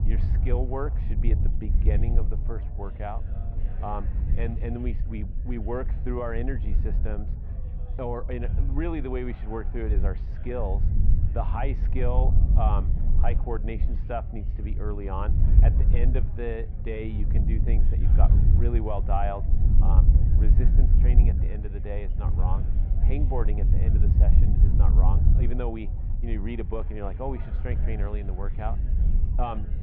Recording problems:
muffled; very; fading above 2.5 kHz
wind noise on the microphone; heavy; 8 dB below the speech
background chatter; noticeable; throughout; 3 voices, 20 dB below the speech

